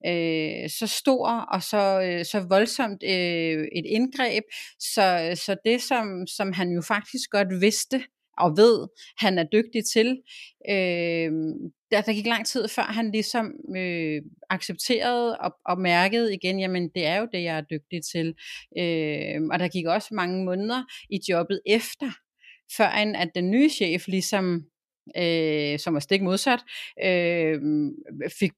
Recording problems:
none

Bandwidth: 14.5 kHz